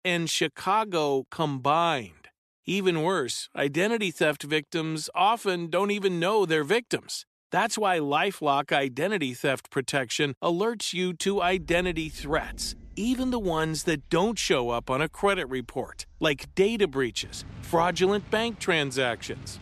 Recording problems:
rain or running water; faint; from 11 s on; 20 dB below the speech

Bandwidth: 13.5 kHz